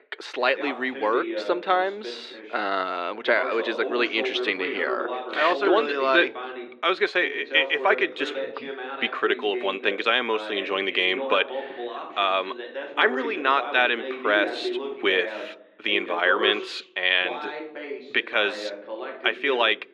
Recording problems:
muffled; slightly; fading above 1.5 kHz
thin; somewhat; fading below 350 Hz
voice in the background; loud; throughout; 10 dB below the speech

